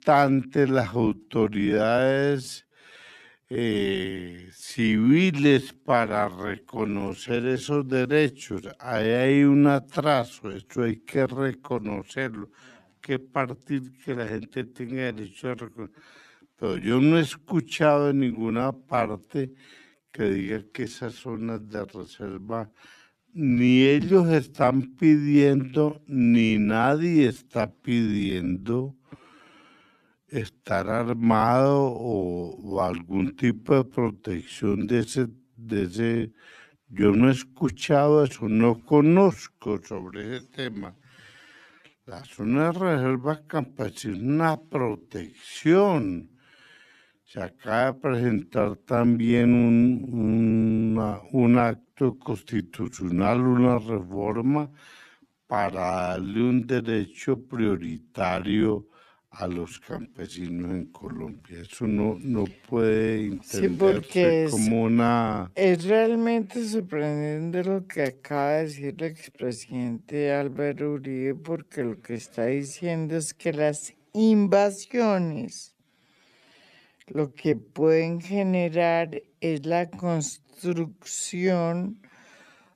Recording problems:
wrong speed, natural pitch; too slow; 0.5 times normal speed

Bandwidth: 14 kHz